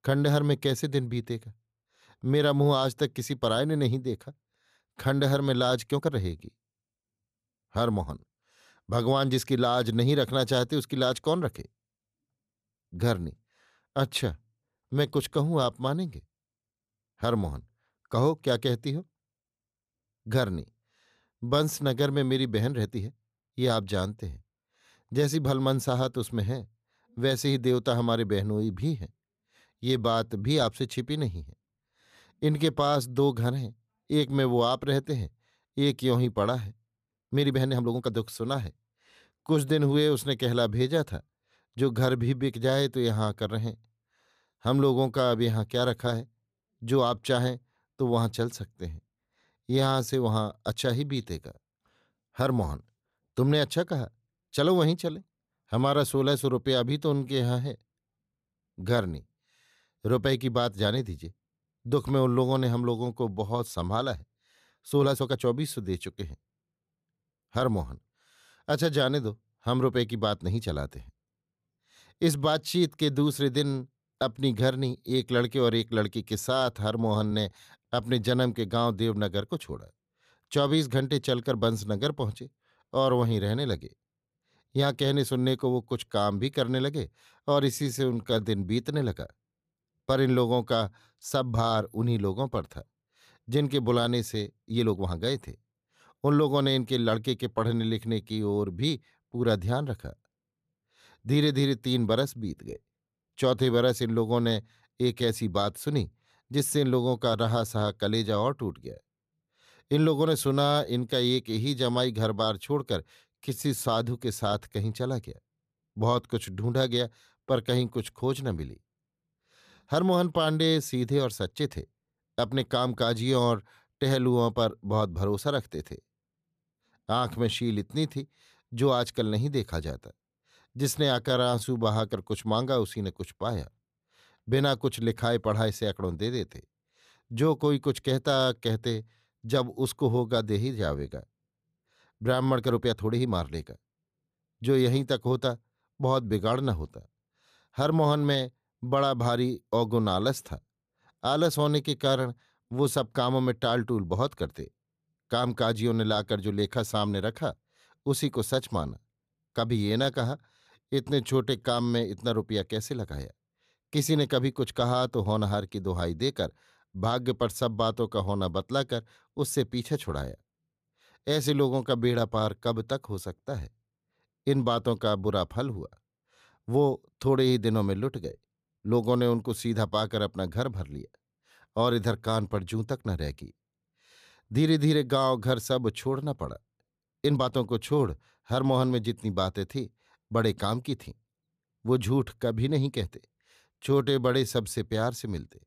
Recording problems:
uneven, jittery; strongly; from 6 s to 3:15

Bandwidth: 14.5 kHz